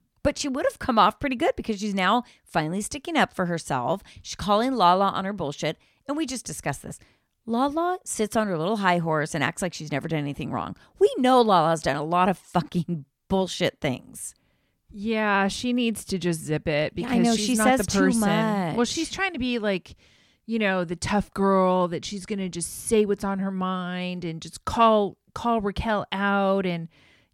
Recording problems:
none

